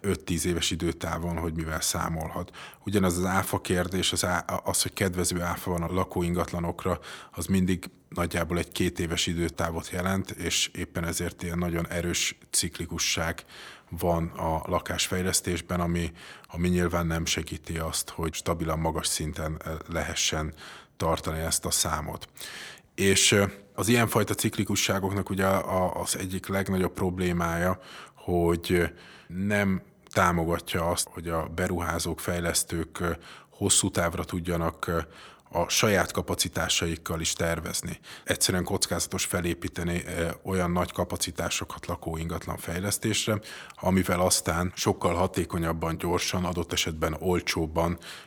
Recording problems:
none

